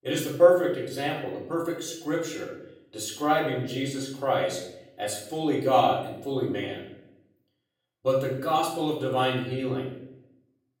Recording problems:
off-mic speech; far
room echo; noticeable; dies away in 0.7 s

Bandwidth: 16 kHz